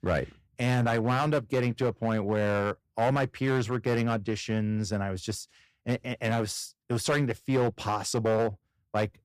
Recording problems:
distortion; slight; 6% of the sound clipped

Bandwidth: 14.5 kHz